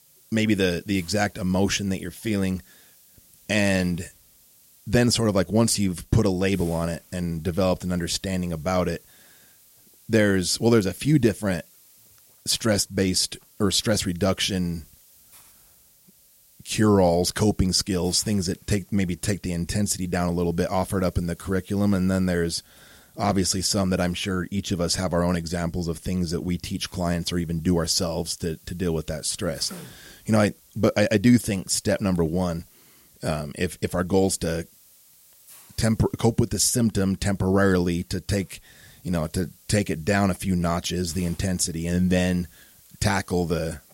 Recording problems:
hiss; faint; throughout; 25 dB below the speech

